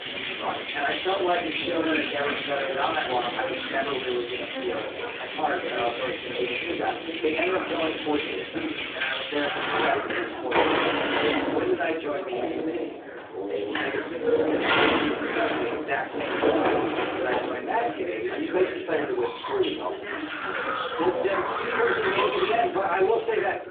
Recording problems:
phone-call audio; poor line
off-mic speech; far
room echo; slight; dies away in 0.4 s
household noises; very loud; throughout; as loud as the speech
background chatter; loud; throughout; 2 voices, 7 dB below the speech
traffic noise; noticeable; throughout; 15 dB below the speech

